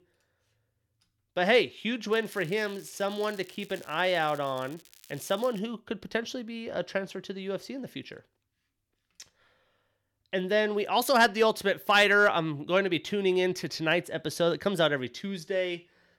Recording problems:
crackling; faint; from 2 to 5.5 s; 25 dB below the speech

